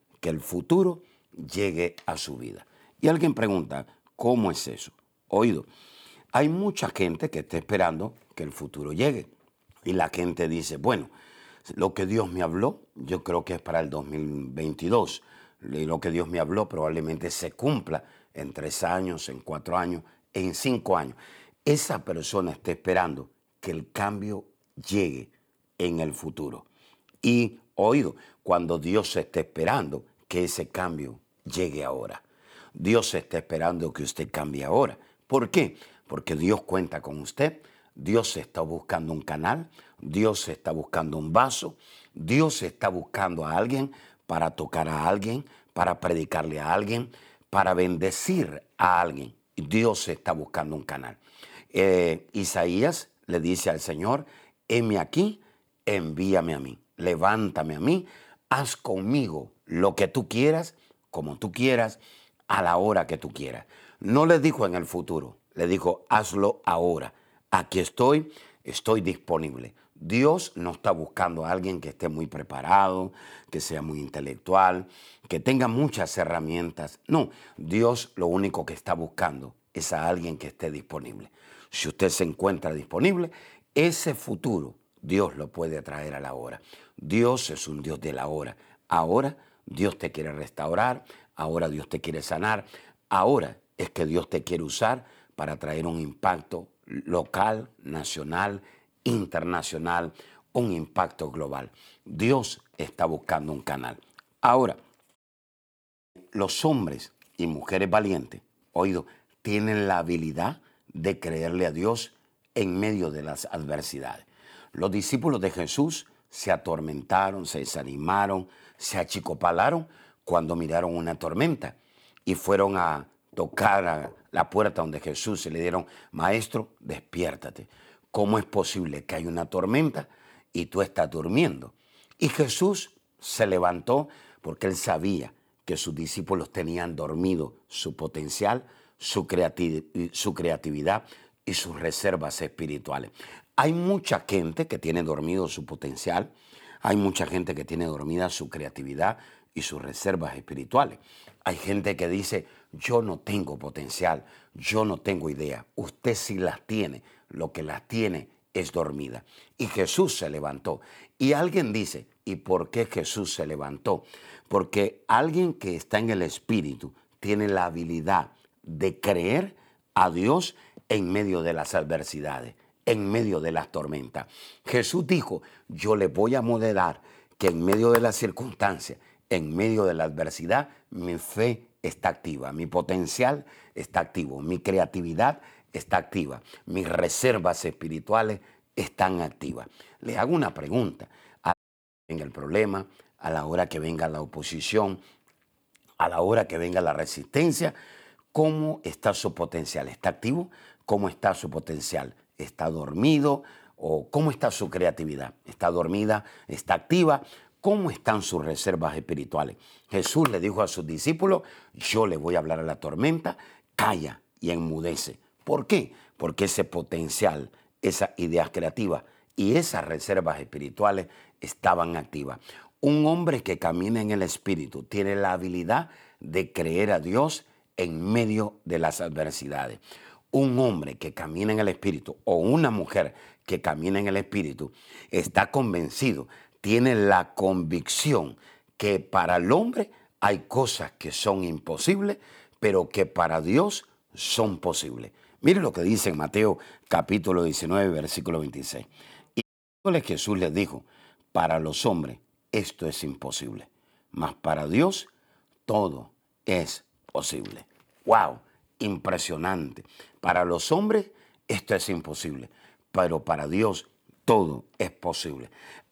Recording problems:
audio cutting out; at 1:45 for 1 s, at 3:12 for 0.5 s and at 4:09

